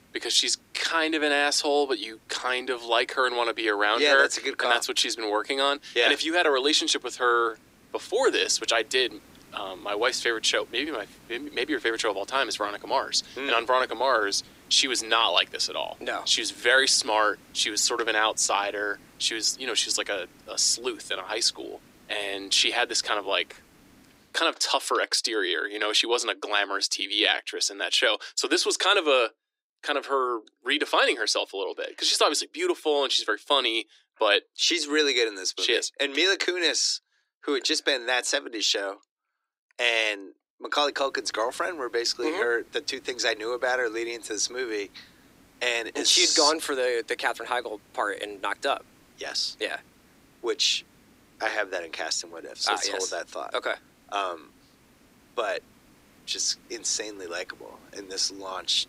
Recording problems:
thin; very; fading below 300 Hz
hiss; faint; until 24 s and from 41 s on; 30 dB below the speech

